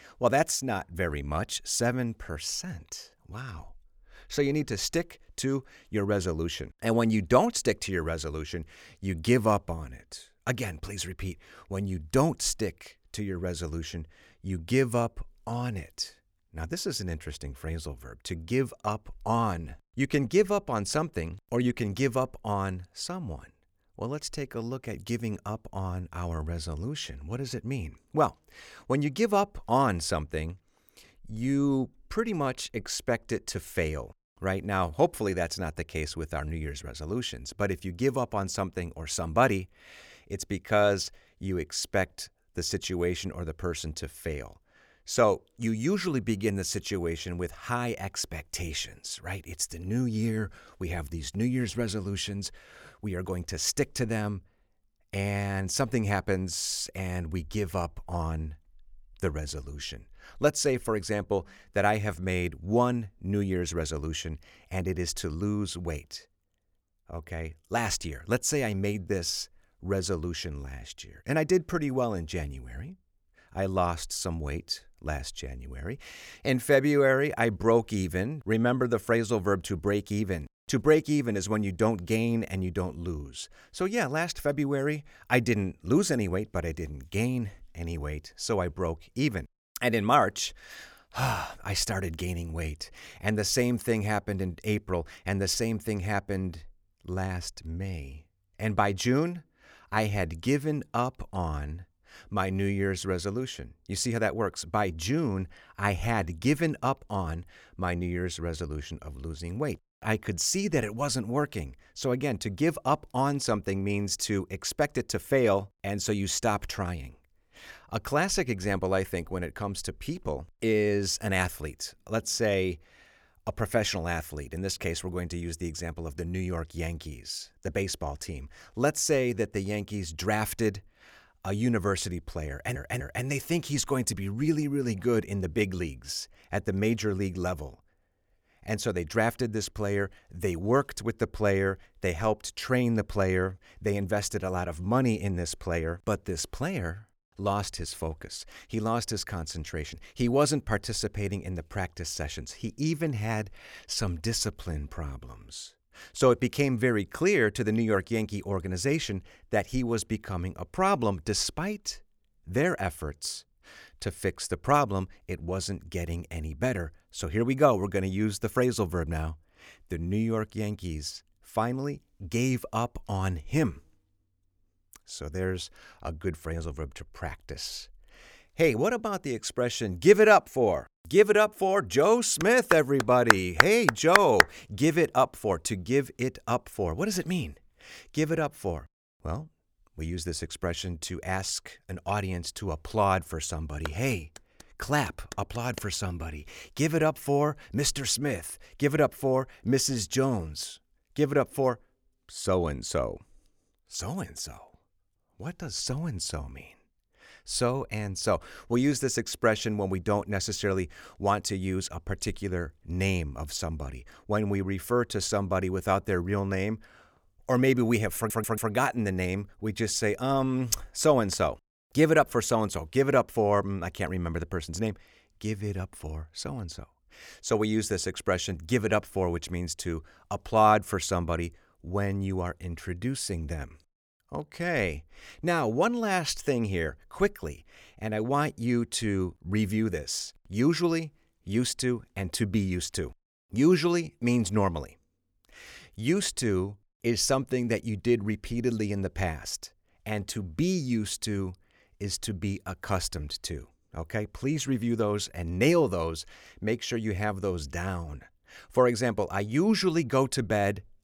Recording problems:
audio stuttering; at 2:13 and at 3:38

